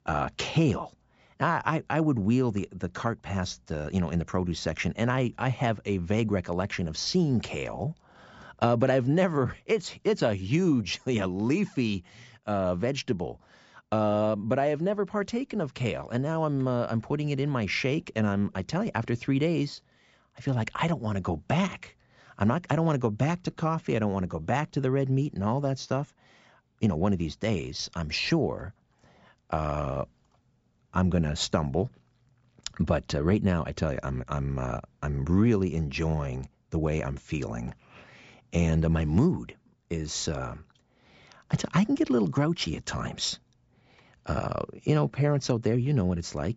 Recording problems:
high frequencies cut off; noticeable; nothing above 8 kHz

